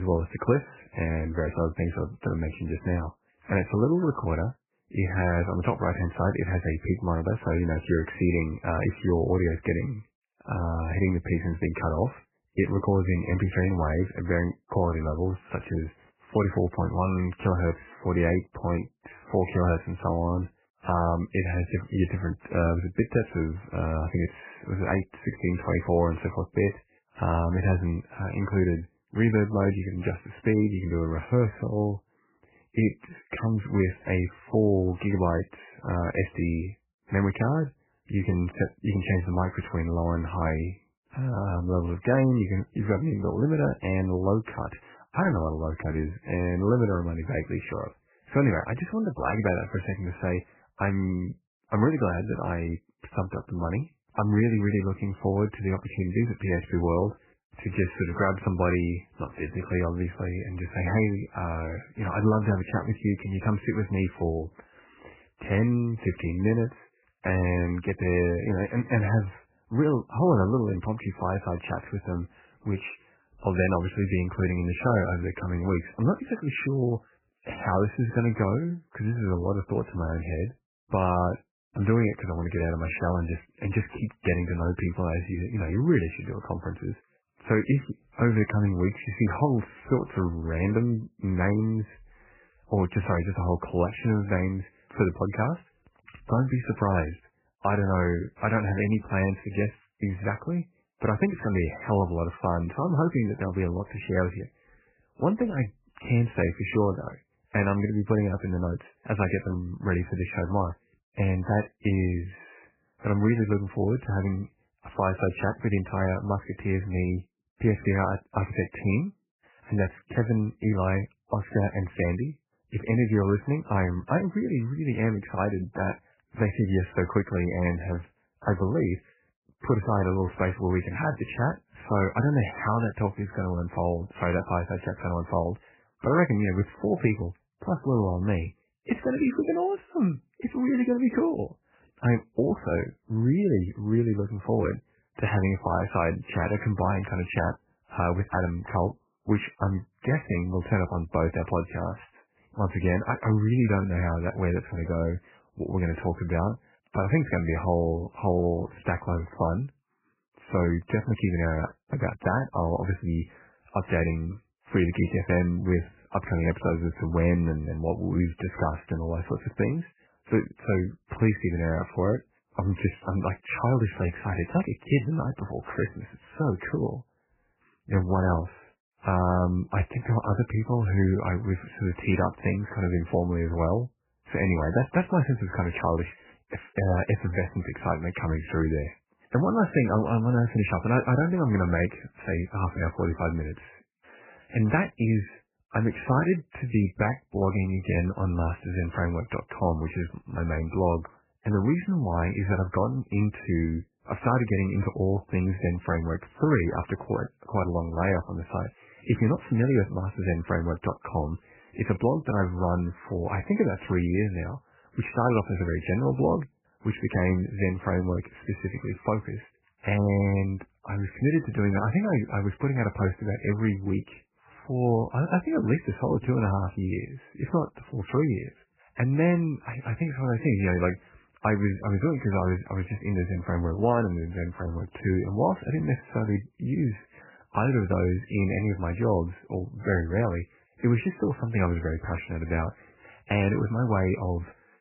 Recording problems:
garbled, watery; badly; nothing above 2.5 kHz
abrupt cut into speech; at the start

